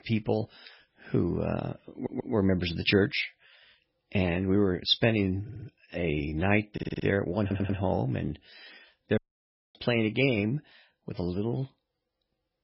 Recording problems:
garbled, watery; badly; nothing above 5.5 kHz
audio stuttering; 4 times, first at 2 s
audio cutting out; at 9 s for 0.5 s

